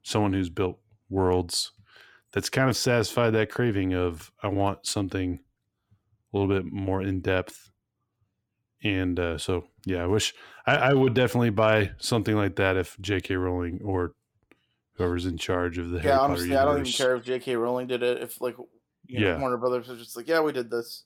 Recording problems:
none

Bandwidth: 17 kHz